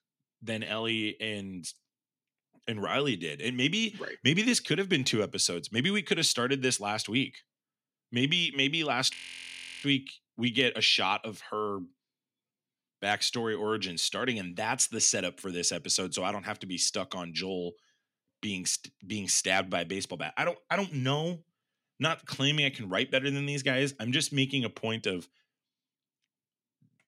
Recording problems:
audio freezing; at 9 s for 0.5 s

